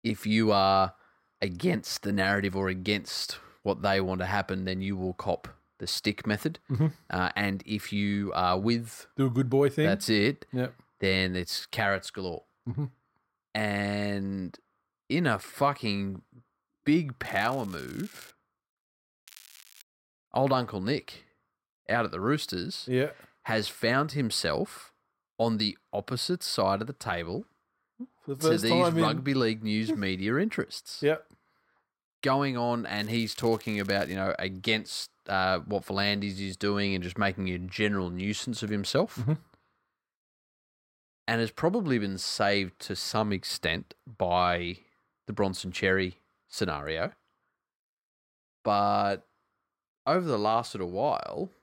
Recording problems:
crackling; faint; from 17 to 18 s, at 19 s and from 33 to 34 s; 20 dB below the speech

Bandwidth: 16 kHz